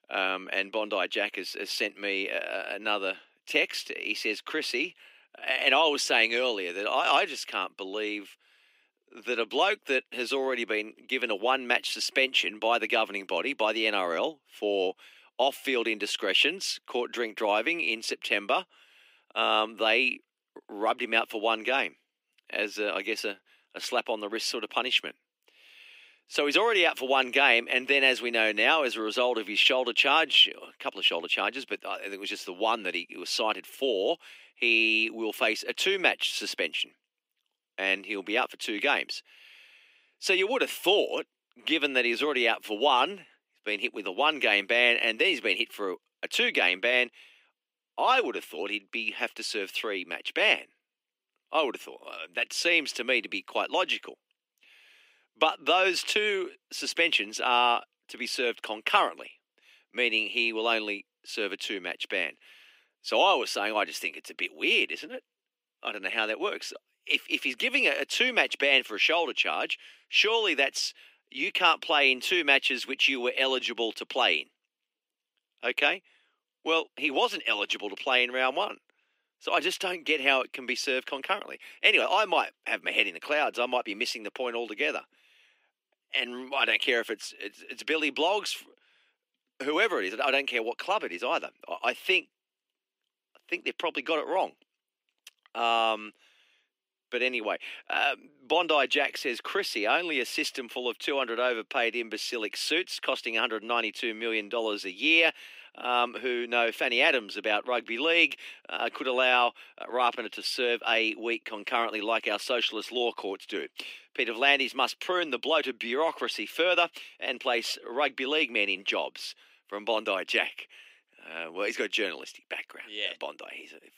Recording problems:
thin; somewhat; fading below 300 Hz

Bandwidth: 15.5 kHz